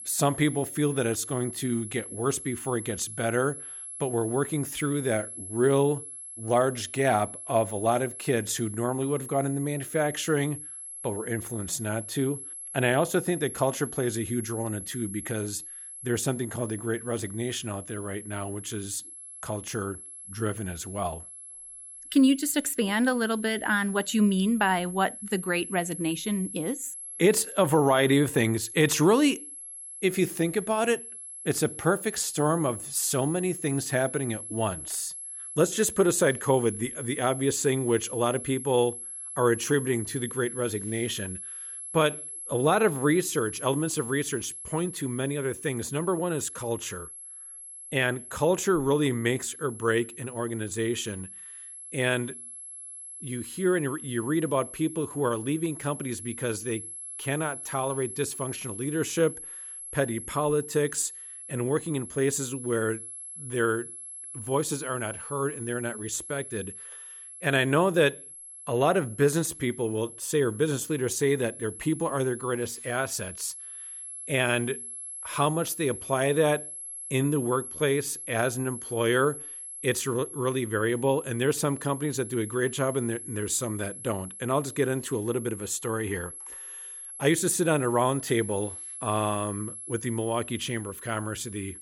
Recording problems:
high-pitched whine; noticeable; throughout; 11 kHz, 10 dB below the speech

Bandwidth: 16 kHz